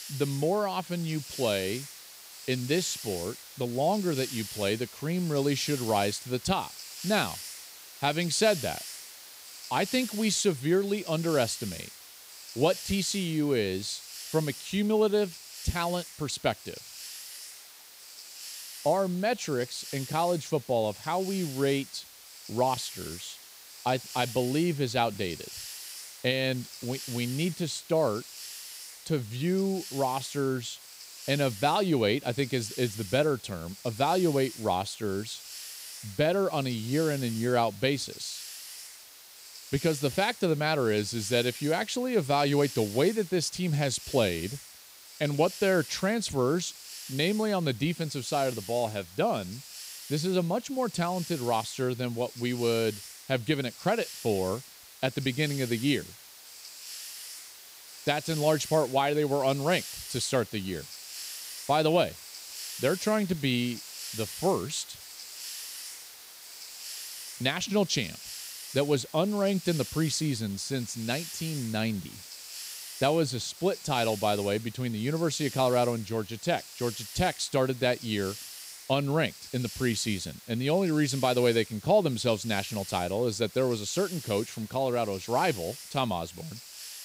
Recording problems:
hiss; noticeable; throughout; 10 dB below the speech

